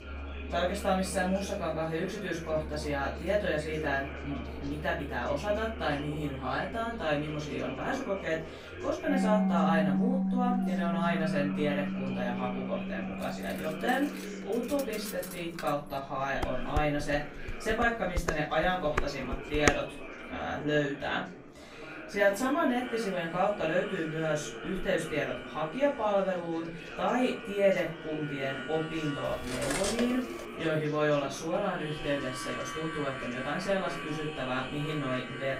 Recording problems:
off-mic speech; far
room echo; slight; dies away in 0.3 s
background music; loud; throughout; 6 dB below the speech
chatter from many people; noticeable; throughout; 10 dB below the speech
clattering dishes; noticeable; from 13 to 16 s and from 29 to 30 s; peak level with the speech
clattering dishes; loud; from 16 to 20 s; peak 3 dB above the speech

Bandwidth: 15.5 kHz